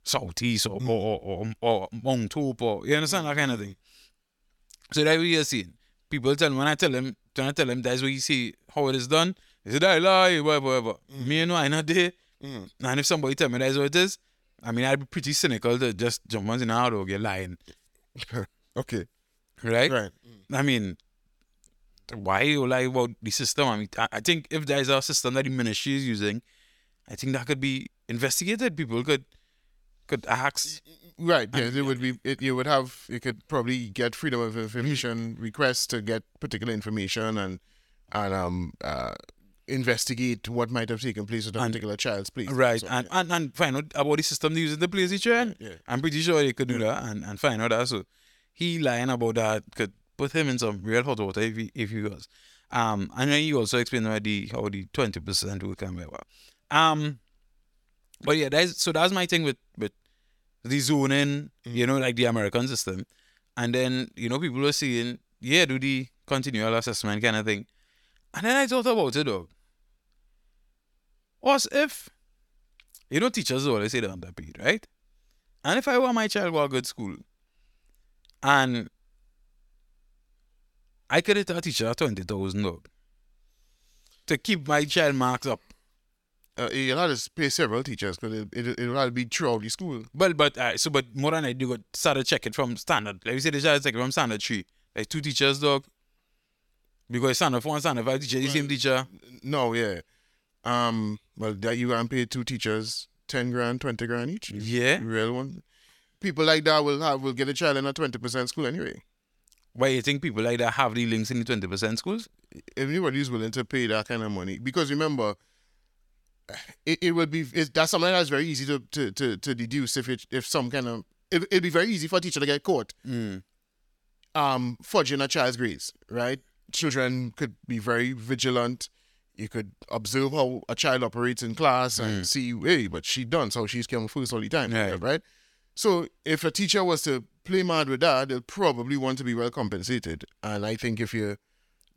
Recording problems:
none

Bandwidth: 17.5 kHz